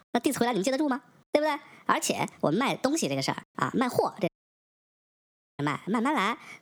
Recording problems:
wrong speed and pitch; too fast and too high; 1.5 times normal speed
squashed, flat; somewhat
audio cutting out; at 4.5 s for 1.5 s

